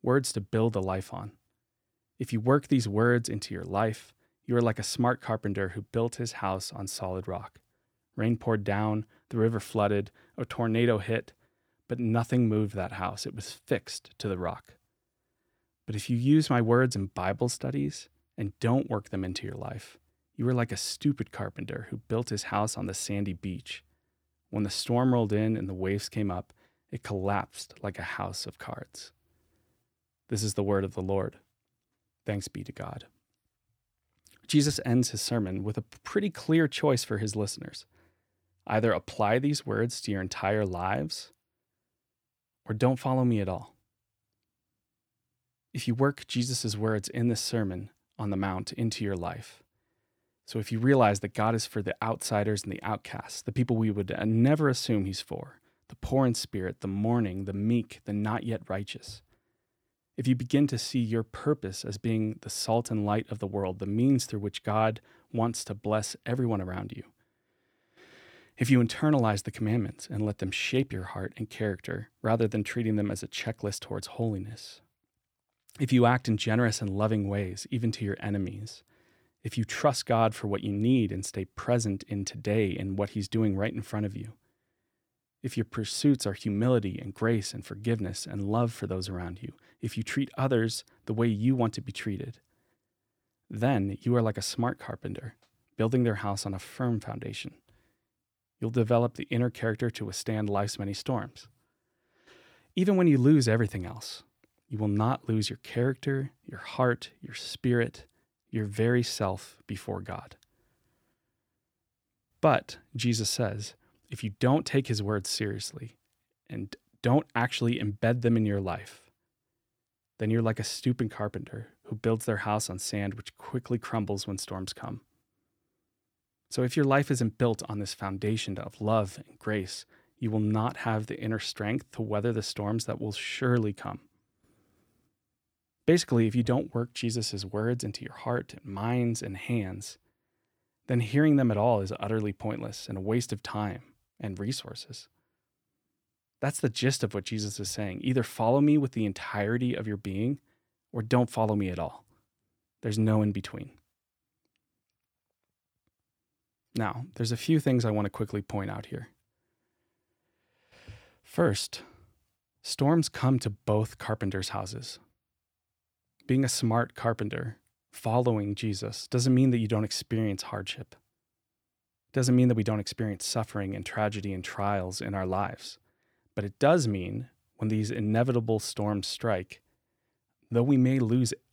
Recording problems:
none

